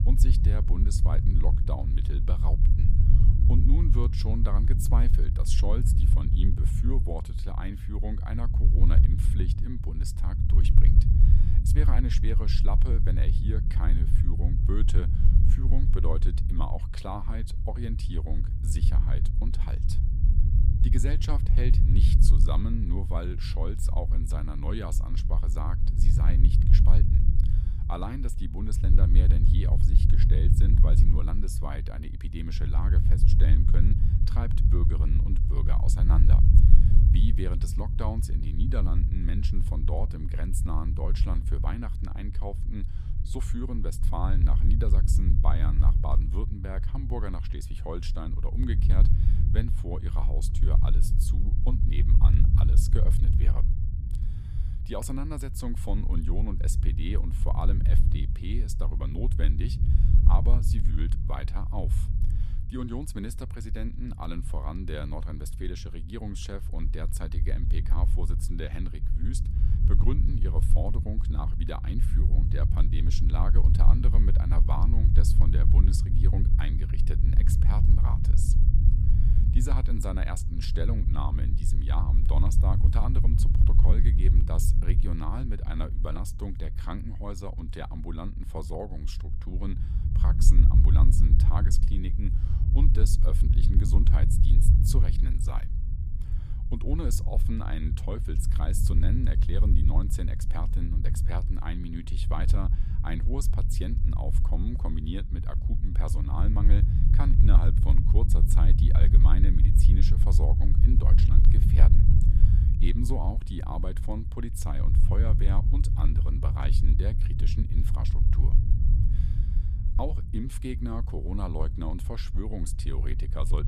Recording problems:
low rumble; loud; throughout; 3 dB below the speech

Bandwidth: 14.5 kHz